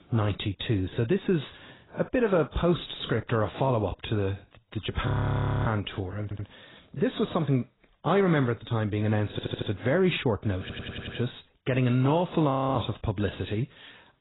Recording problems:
garbled, watery; badly; nothing above 4 kHz
audio freezing; at 5 s for 0.5 s and at 13 s
audio stuttering; at 6 s, at 9.5 s and at 11 s

